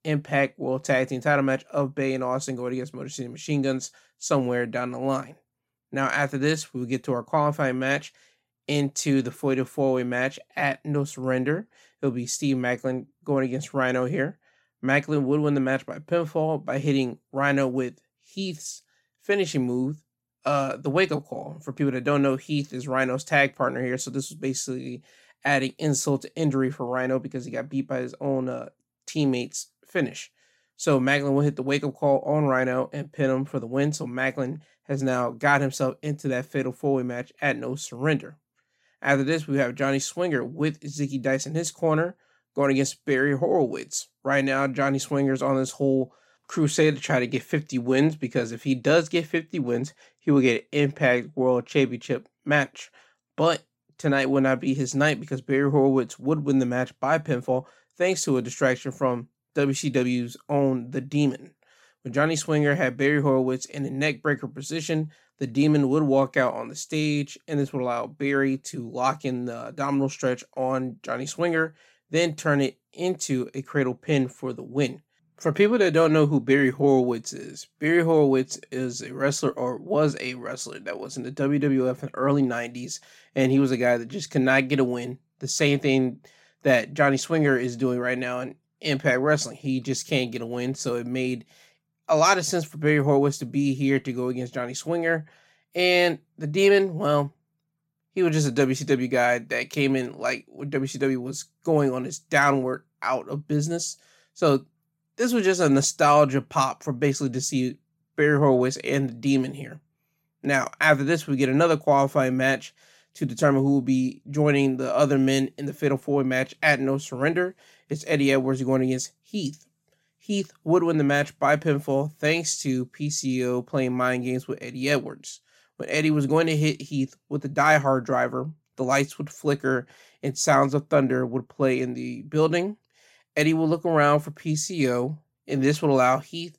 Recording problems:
none

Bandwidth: 16 kHz